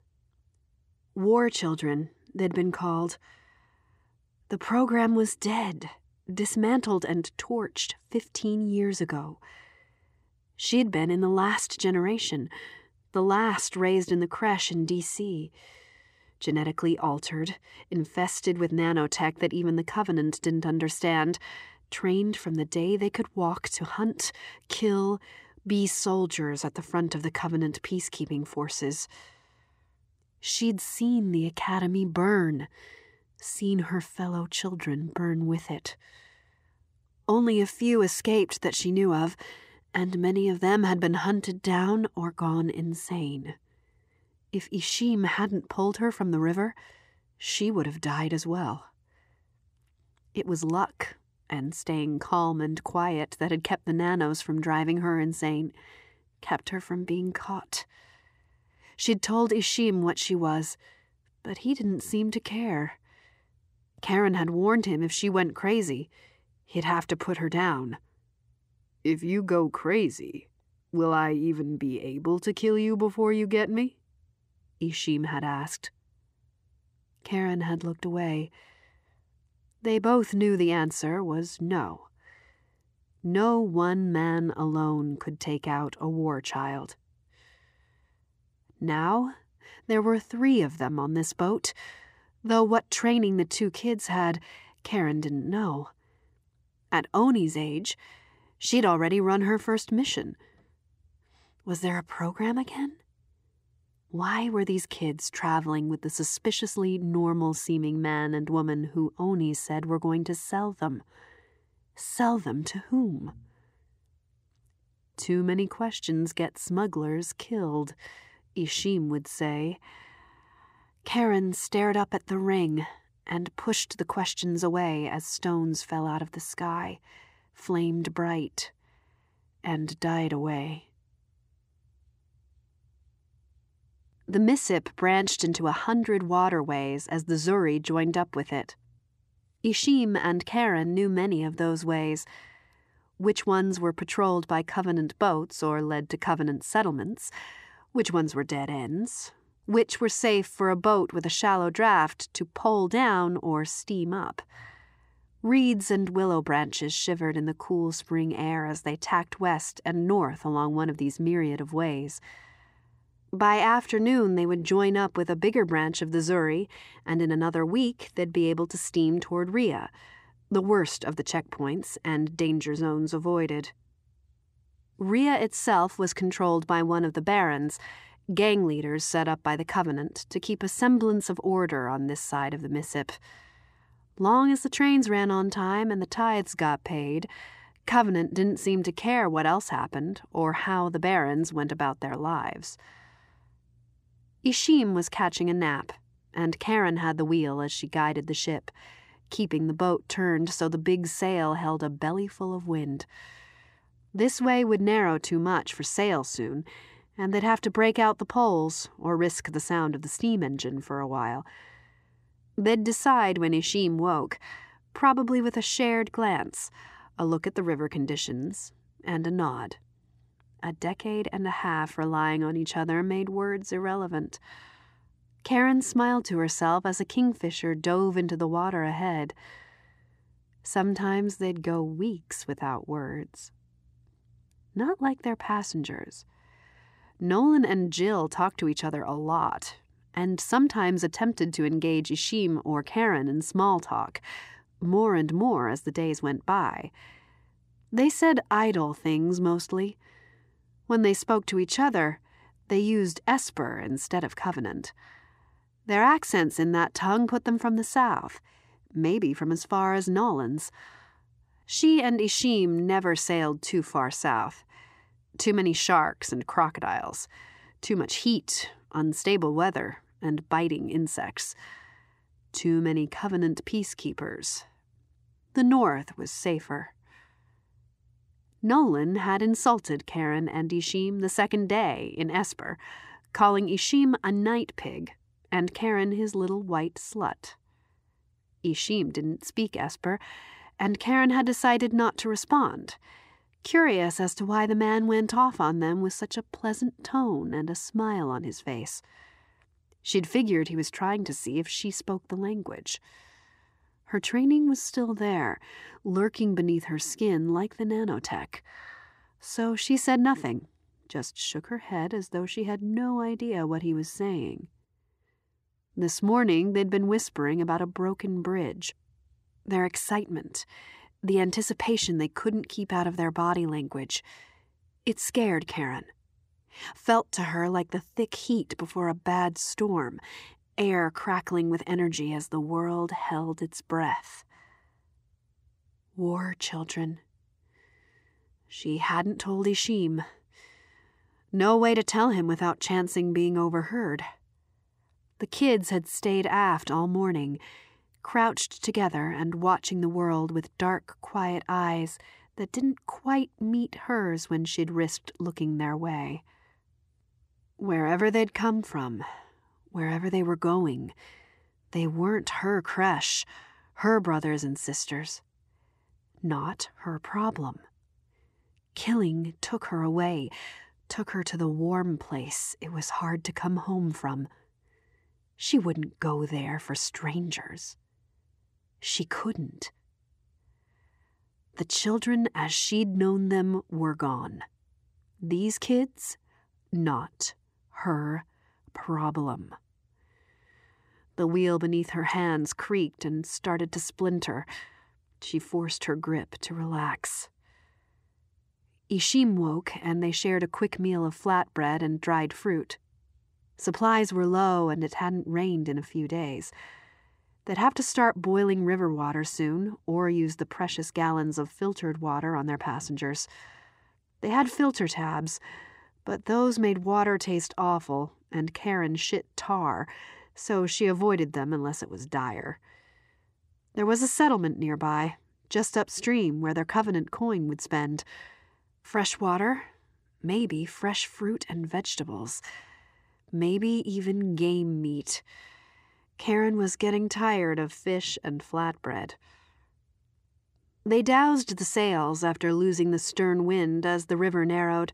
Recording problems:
none

